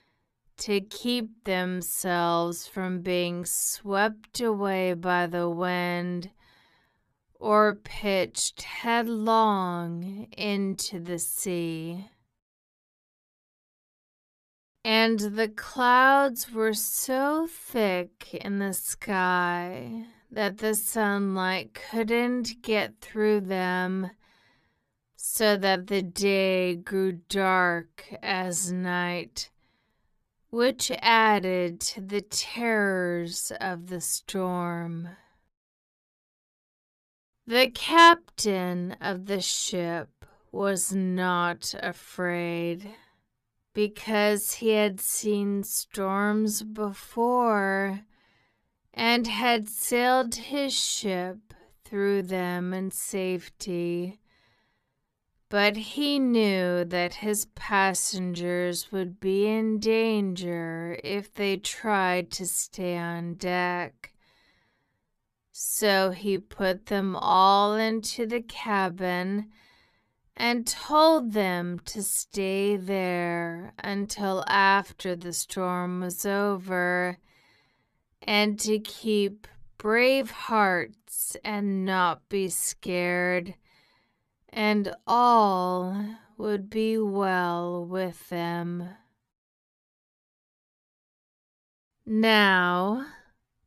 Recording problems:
wrong speed, natural pitch; too slow; 0.5 times normal speed

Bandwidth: 14.5 kHz